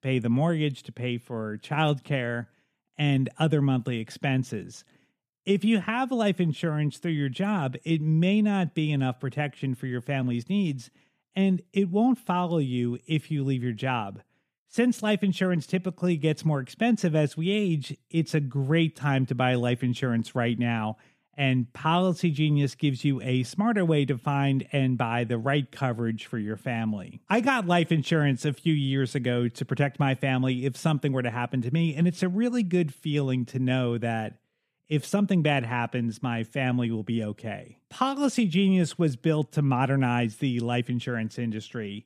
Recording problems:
none

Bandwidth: 14.5 kHz